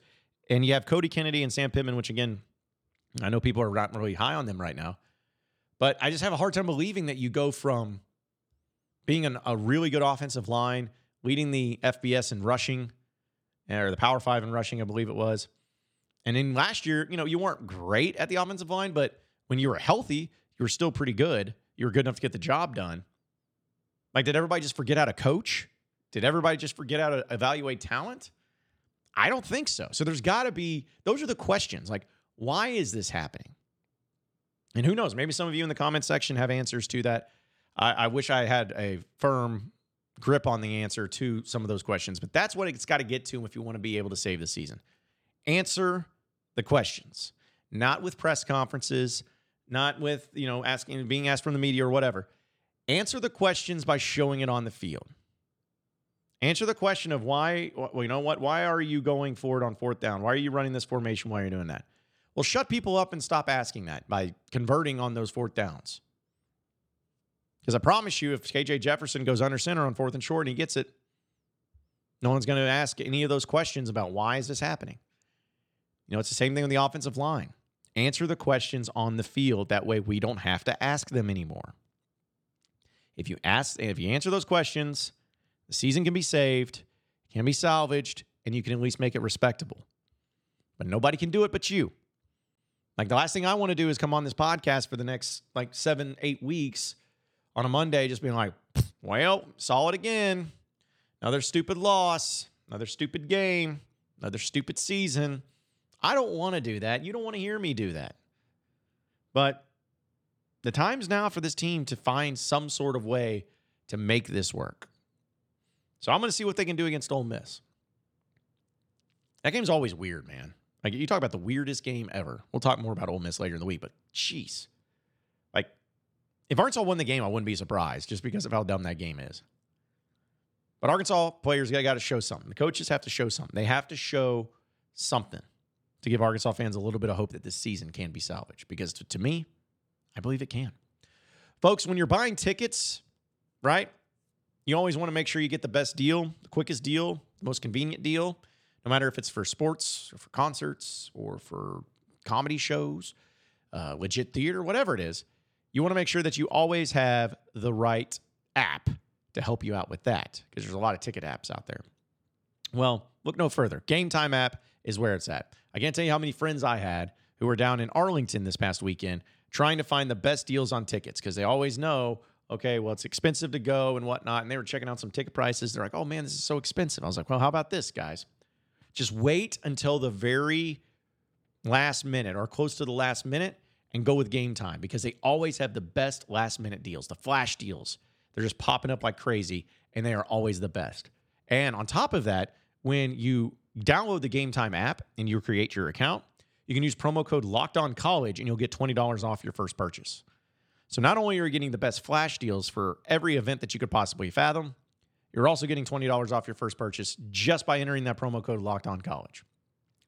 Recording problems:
none

